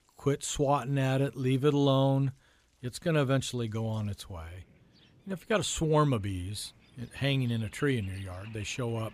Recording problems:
rain or running water; faint; throughout; 25 dB below the speech

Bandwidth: 15 kHz